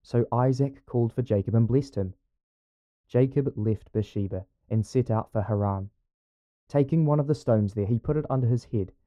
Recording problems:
muffled; very; fading above 1.5 kHz

